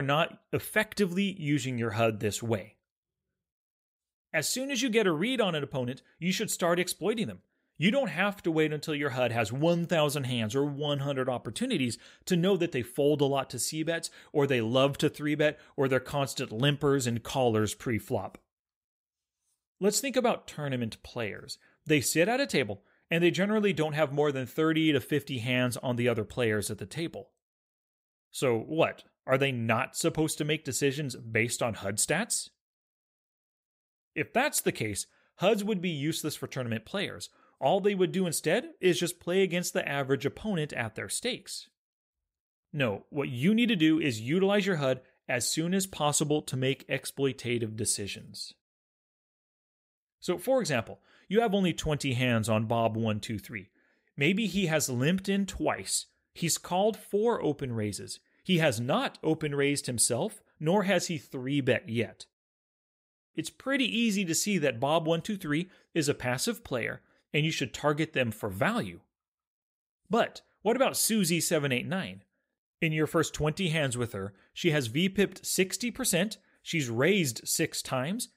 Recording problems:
abrupt cut into speech; at the start

